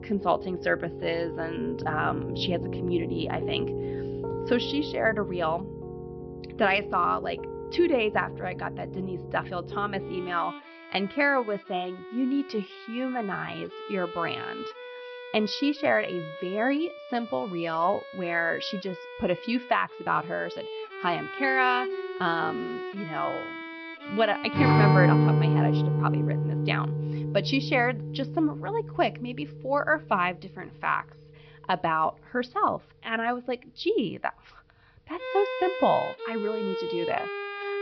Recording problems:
high frequencies cut off; noticeable; nothing above 5.5 kHz
background music; loud; throughout; 3 dB below the speech

